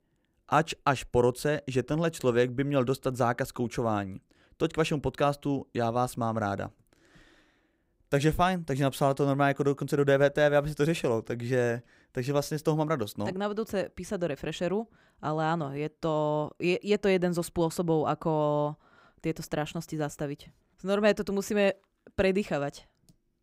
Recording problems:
none

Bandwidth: 15.5 kHz